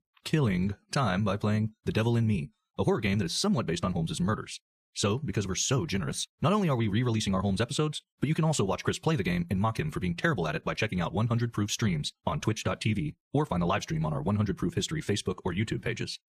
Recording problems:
wrong speed, natural pitch; too fast; 1.5 times normal speed

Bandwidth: 14.5 kHz